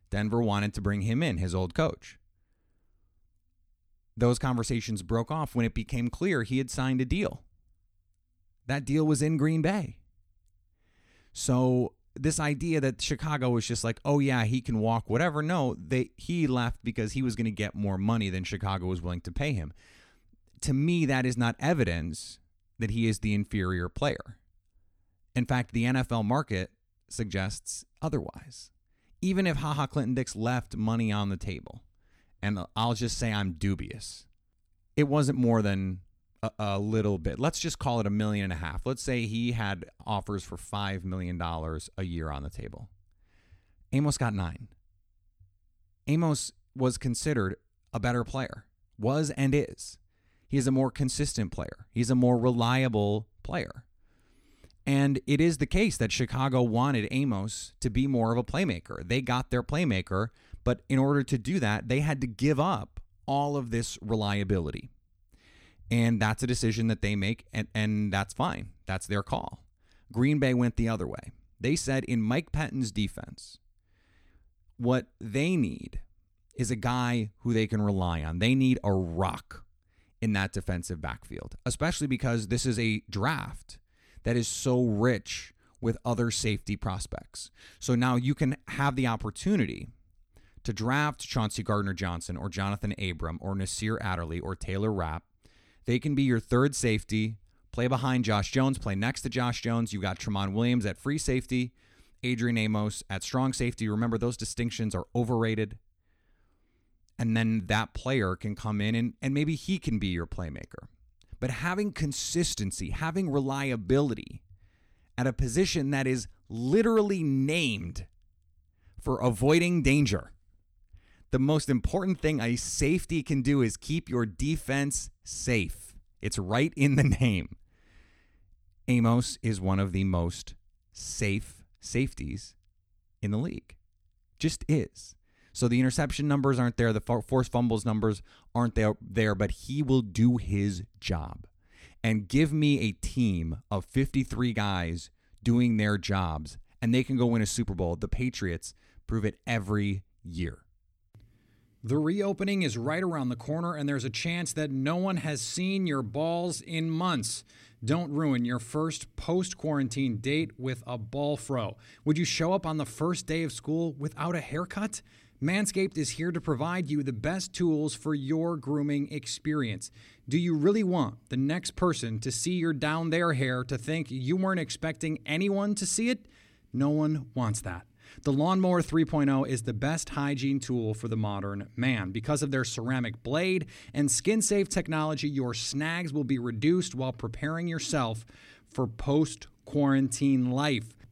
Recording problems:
none

